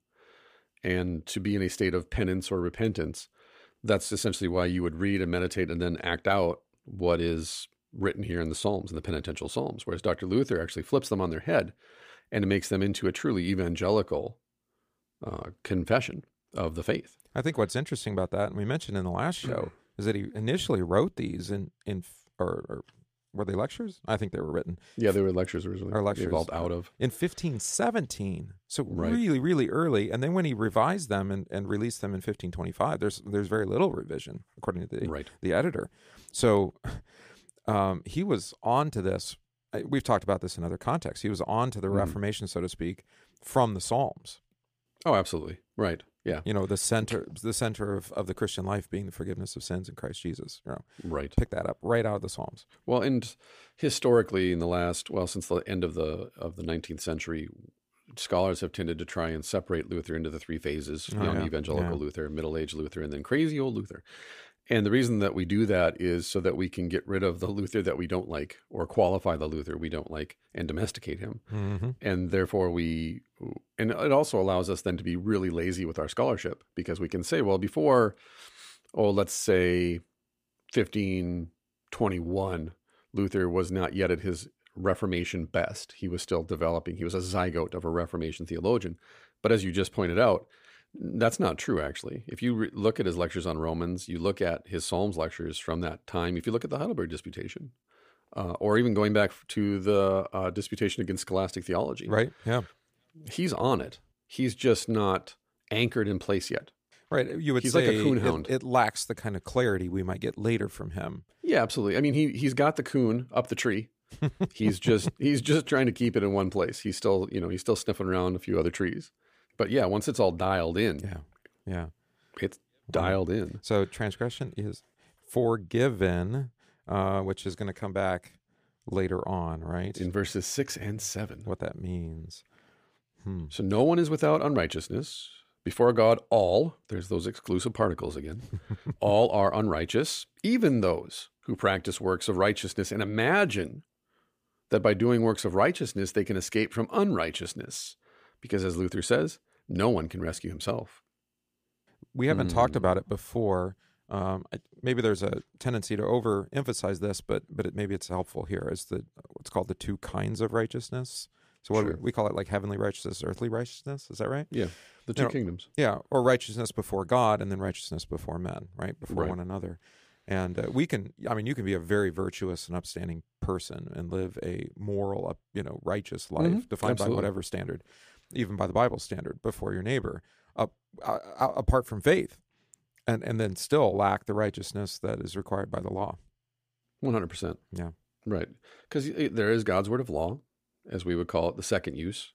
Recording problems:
none

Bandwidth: 15 kHz